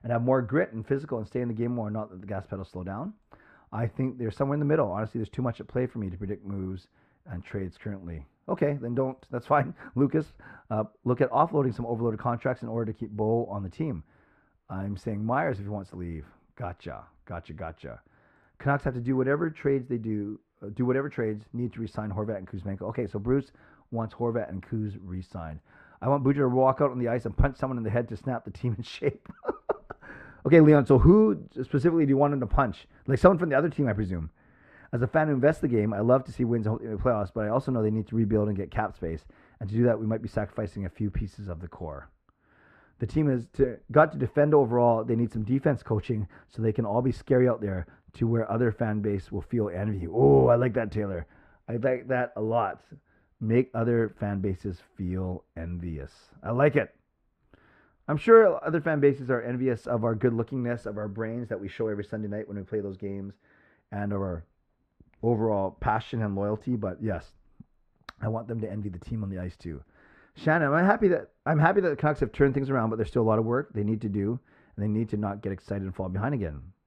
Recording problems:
muffled; very; fading above 4 kHz

